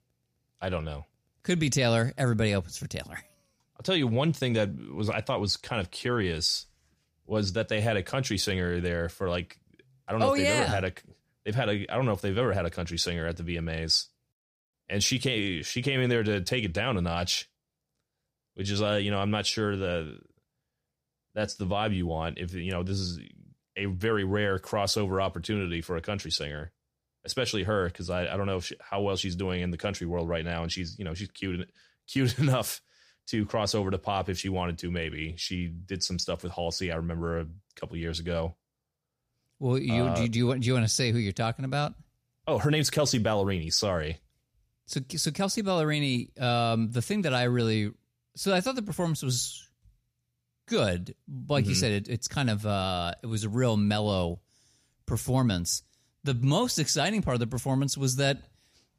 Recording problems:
none

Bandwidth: 14.5 kHz